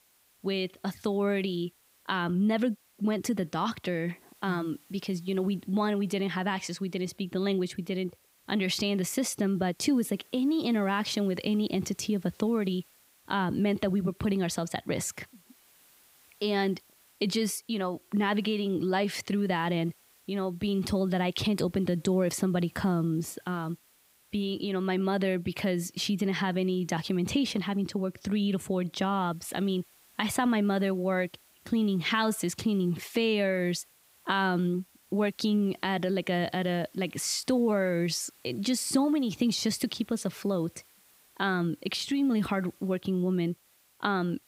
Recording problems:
hiss; faint; throughout; 30 dB below the speech

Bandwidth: 15.5 kHz